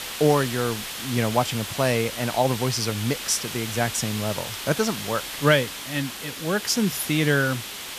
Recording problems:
hiss; loud; throughout; 7 dB below the speech
train or aircraft noise; faint; throughout; 30 dB below the speech

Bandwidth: 14.5 kHz